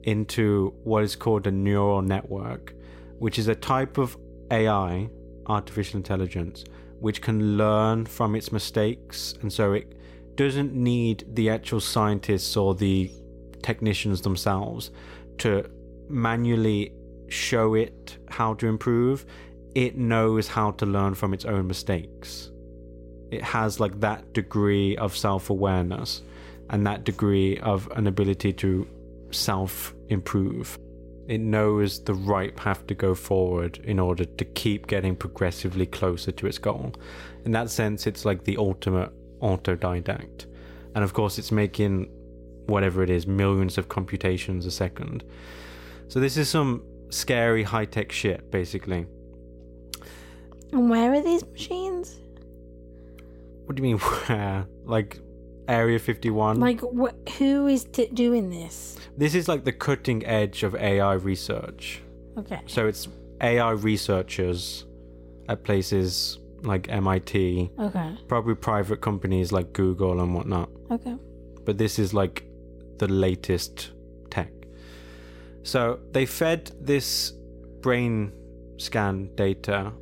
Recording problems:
electrical hum; faint; throughout; 60 Hz, 25 dB below the speech

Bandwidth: 16 kHz